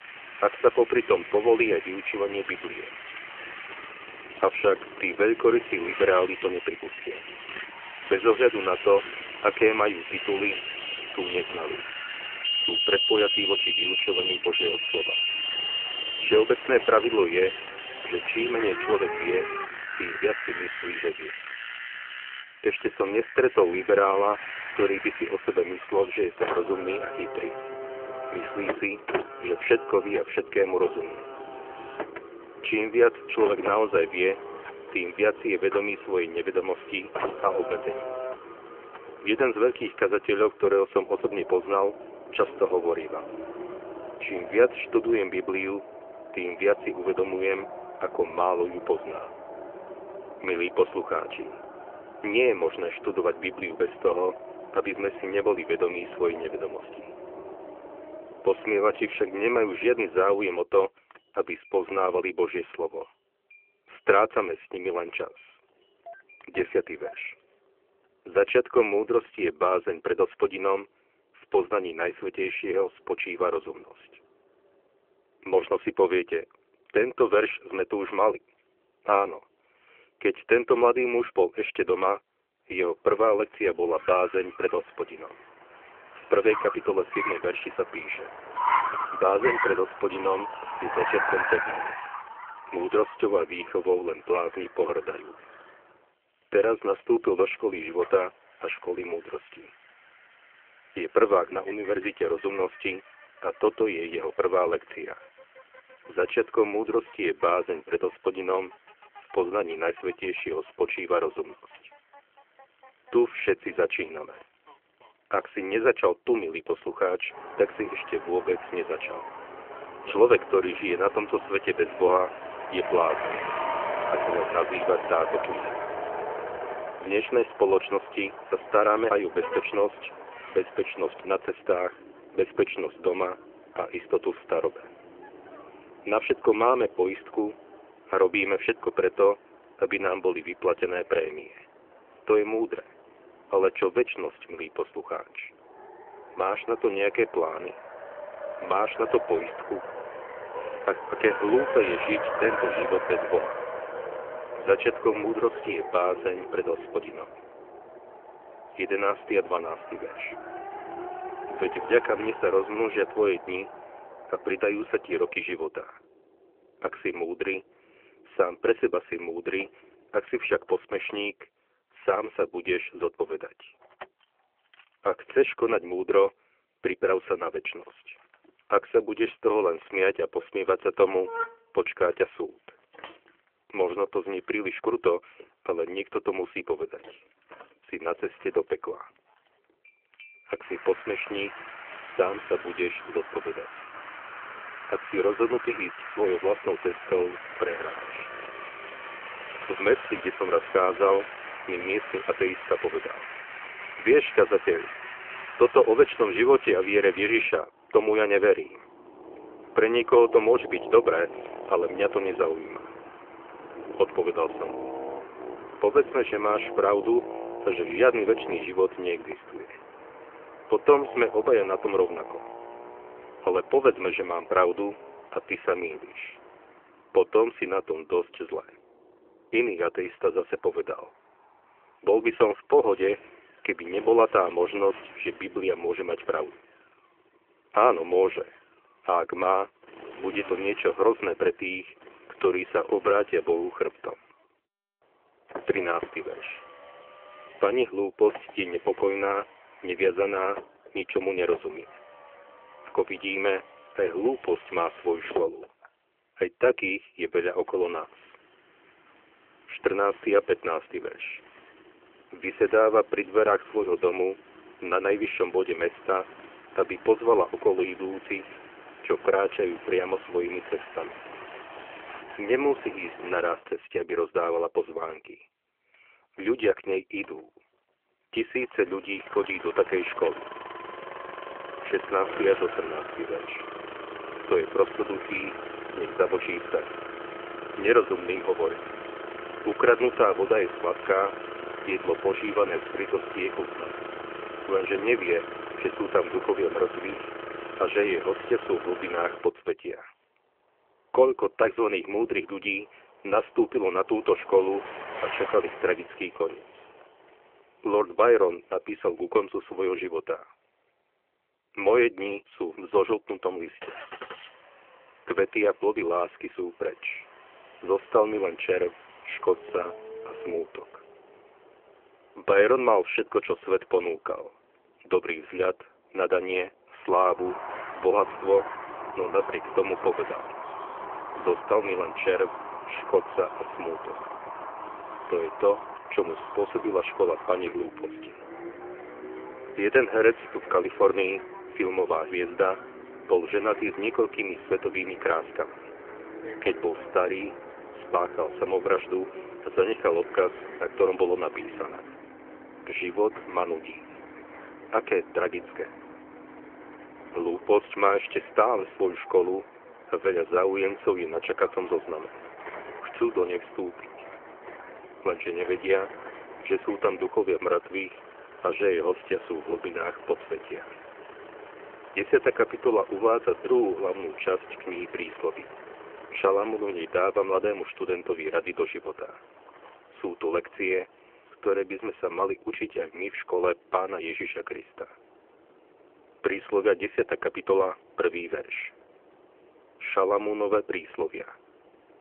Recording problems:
phone-call audio
traffic noise; loud; throughout; 9 dB below the speech

